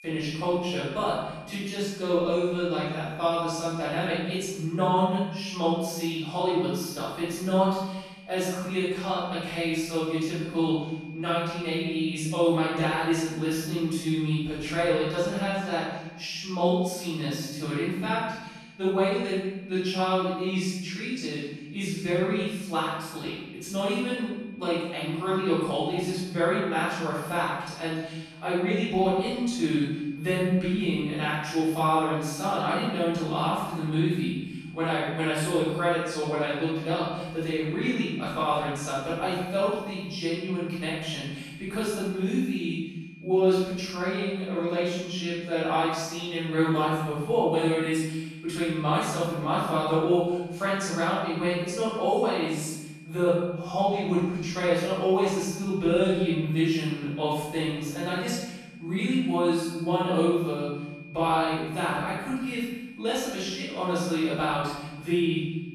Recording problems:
room echo; strong; dies away in 1.1 s
off-mic speech; far
high-pitched whine; faint; throughout; 2.5 kHz, 20 dB below the speech

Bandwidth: 13.5 kHz